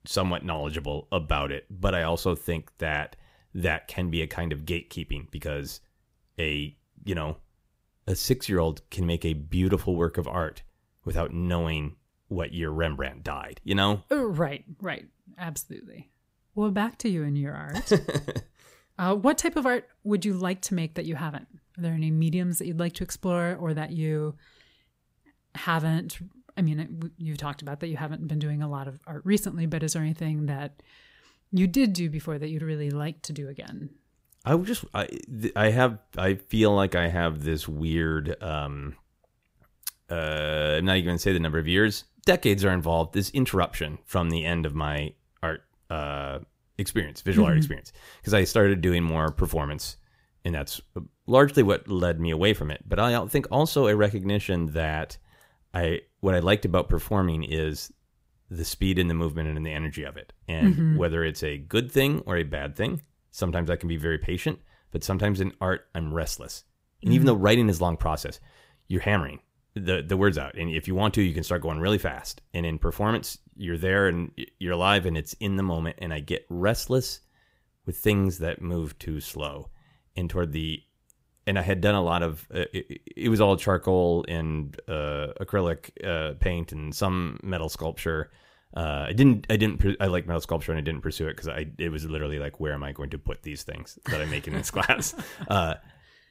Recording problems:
none

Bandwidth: 15.5 kHz